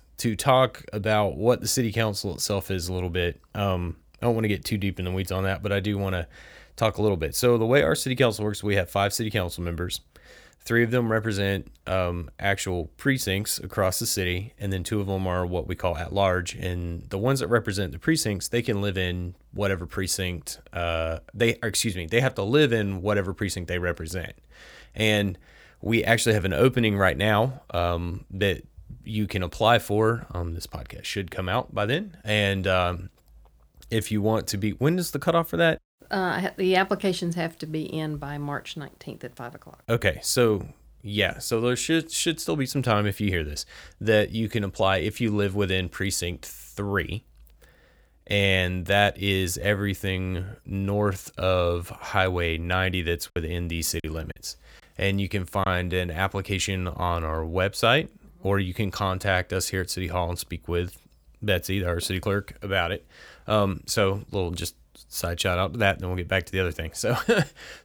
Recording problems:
choppy; occasionally; from 53 to 56 s; 4% of the speech affected

